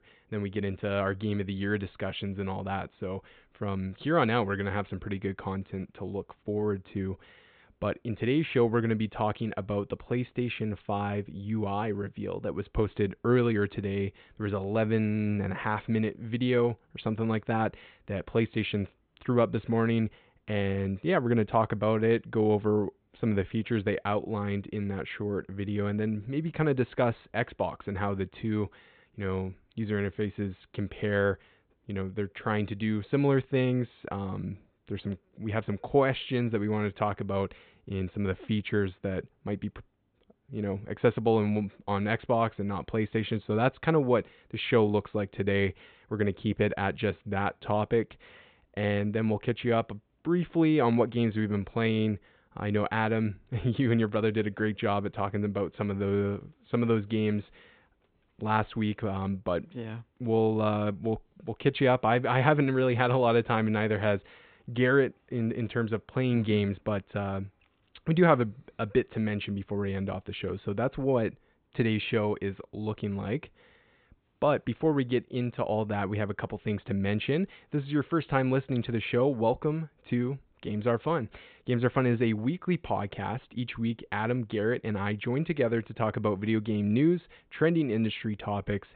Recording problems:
high frequencies cut off; severe; nothing above 4 kHz

